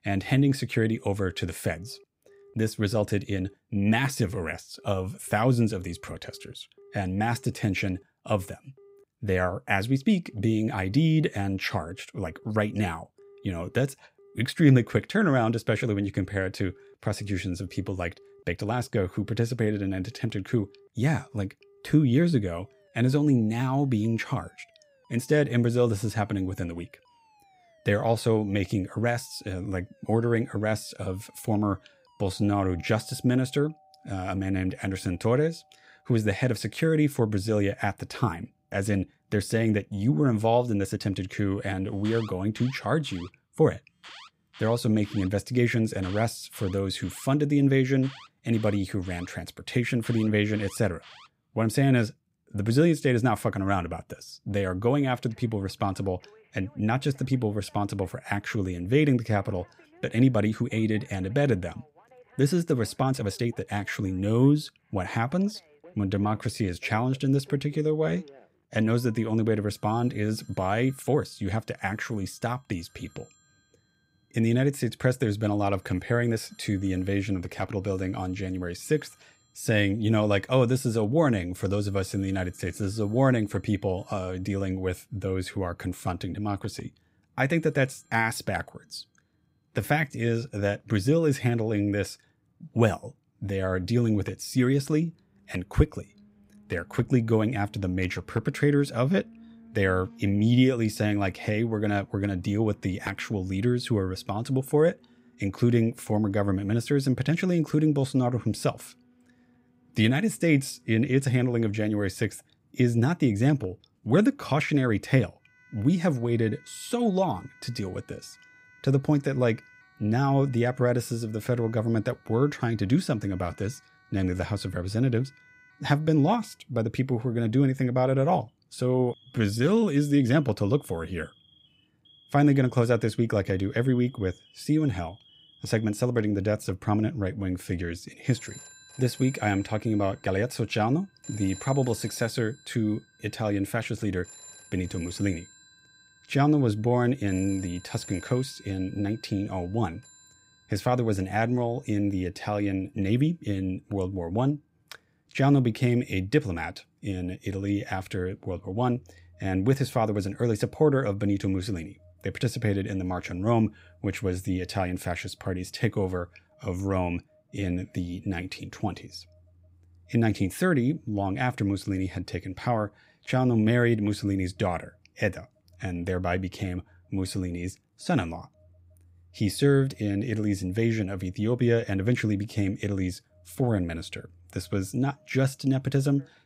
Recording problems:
alarms or sirens; faint; throughout; 25 dB below the speech
uneven, jittery; strongly; from 12 s to 2:48

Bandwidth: 15.5 kHz